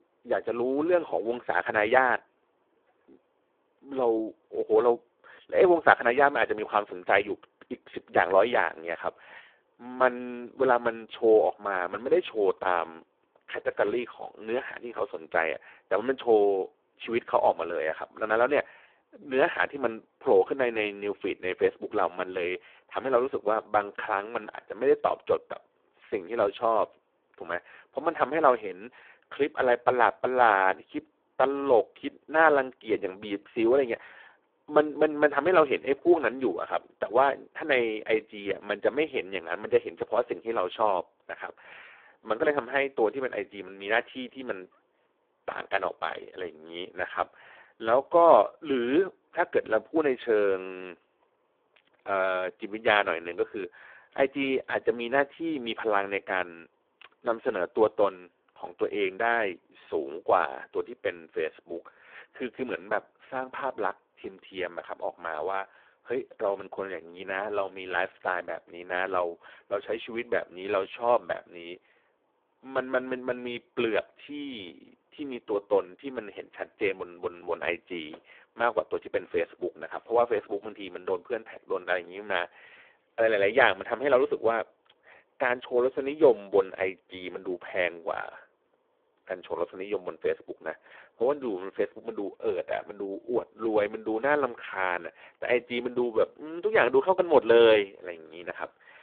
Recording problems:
phone-call audio; poor line

